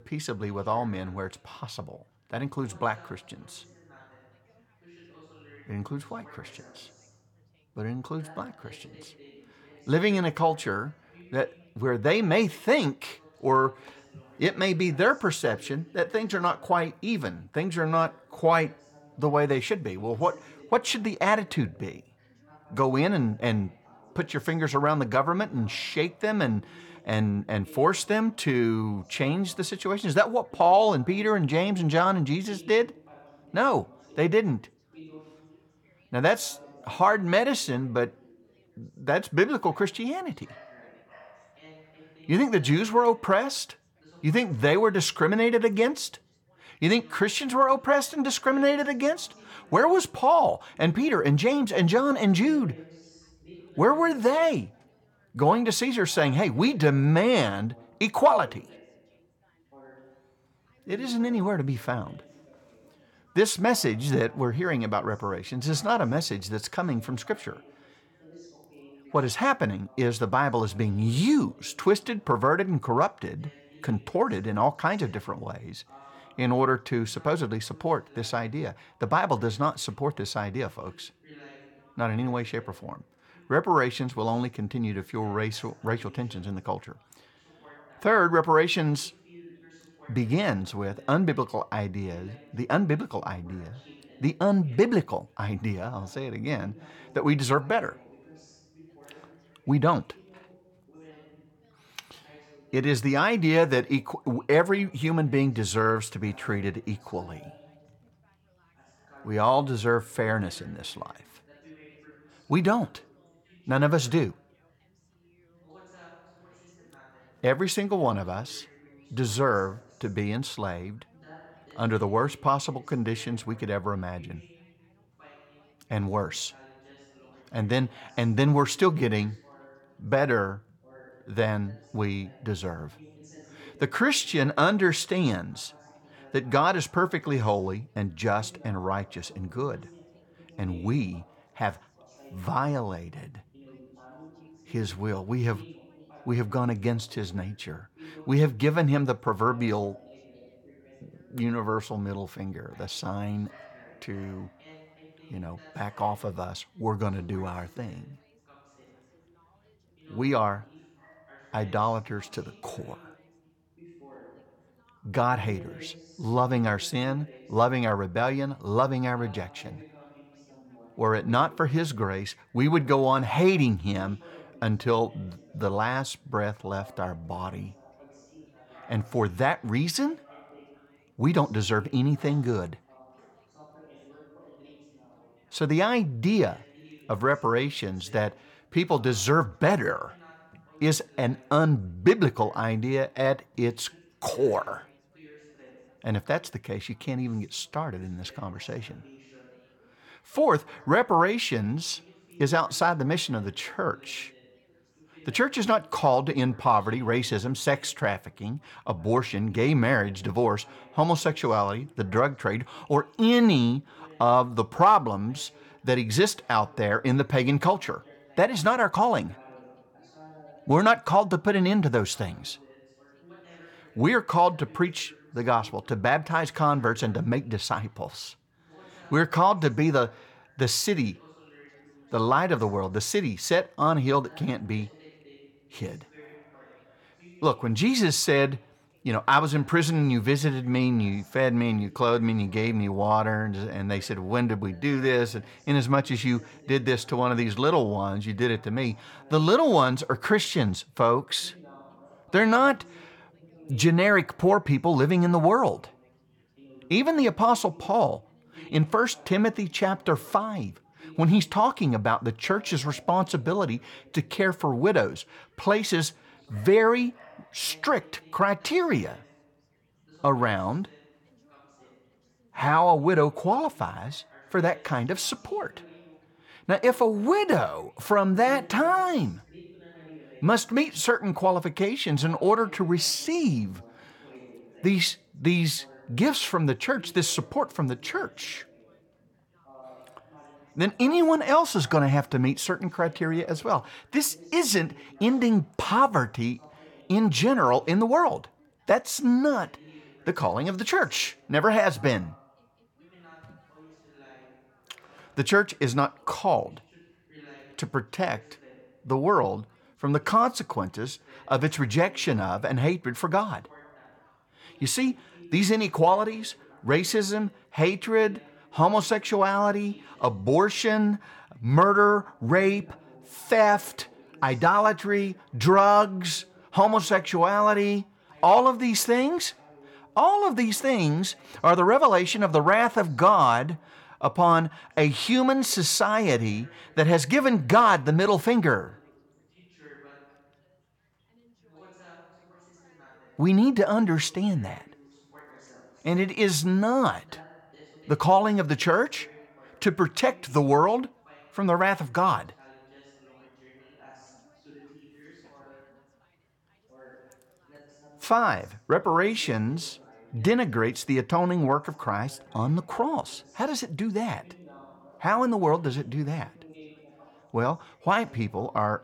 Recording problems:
background chatter; faint; throughout; 3 voices, 30 dB below the speech

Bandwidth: 17.5 kHz